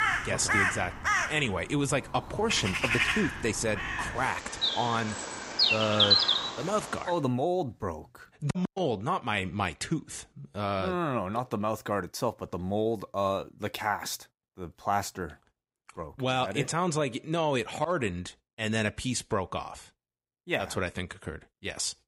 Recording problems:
animal sounds; very loud; until 7 s; 4 dB above the speech

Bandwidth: 15.5 kHz